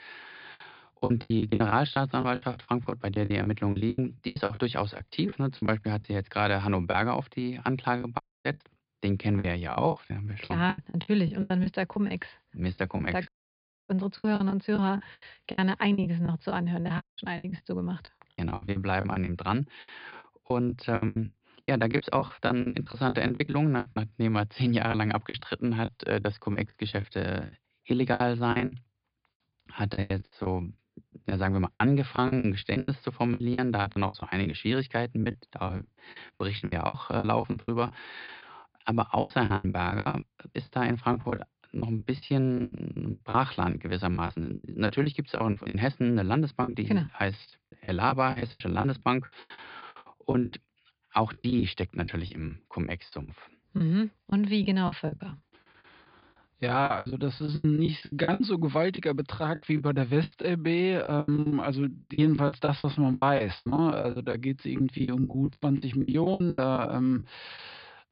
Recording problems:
high frequencies cut off; severe; nothing above 5 kHz
choppy; very; 16% of the speech affected
audio cutting out; at 8 s, at 13 s for 0.5 s and at 17 s

